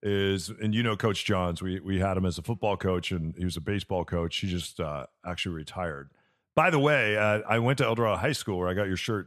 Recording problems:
none

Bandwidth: 13.5 kHz